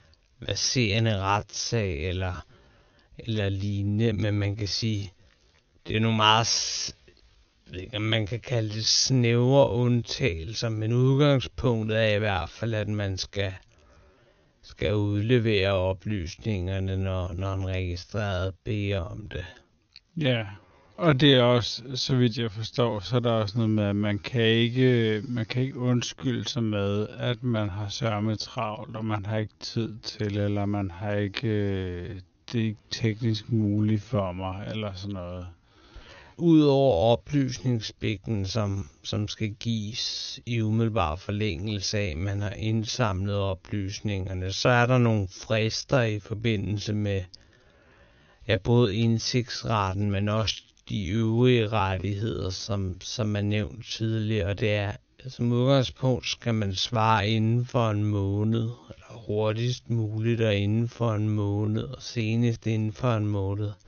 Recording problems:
wrong speed, natural pitch; too slow; 0.5 times normal speed
high frequencies cut off; noticeable; nothing above 6.5 kHz

